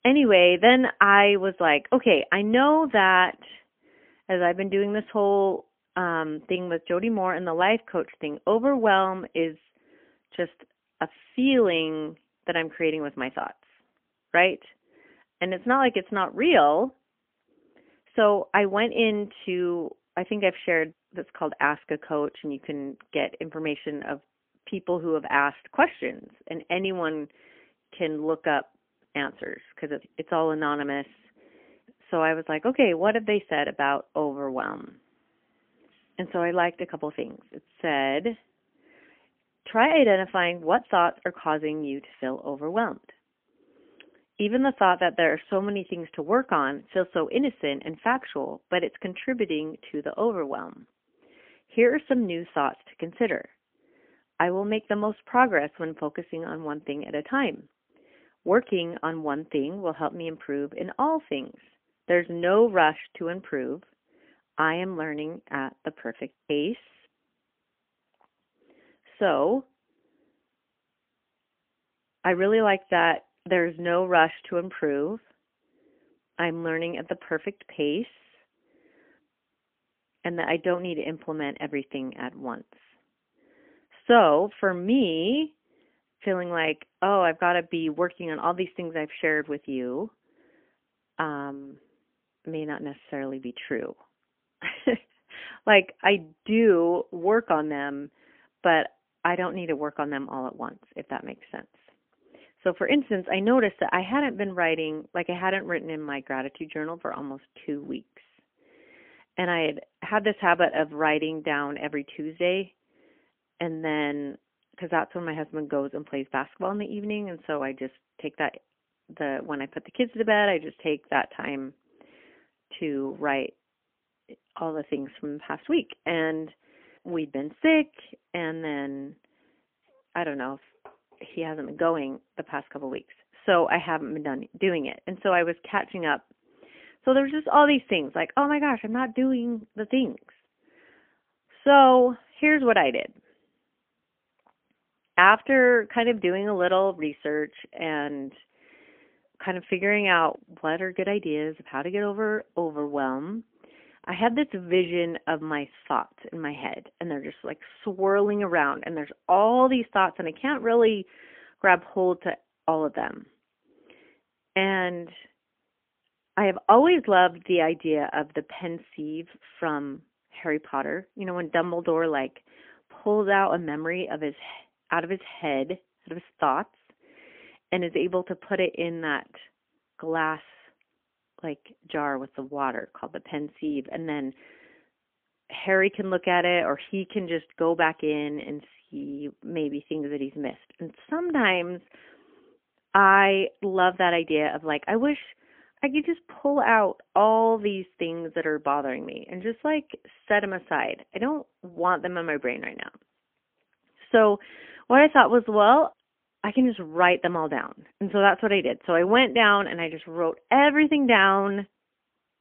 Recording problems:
phone-call audio; poor line; nothing above 3.5 kHz

